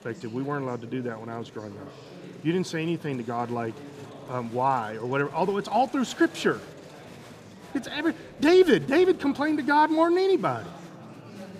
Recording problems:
murmuring crowd; noticeable; throughout; 20 dB below the speech

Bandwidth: 14.5 kHz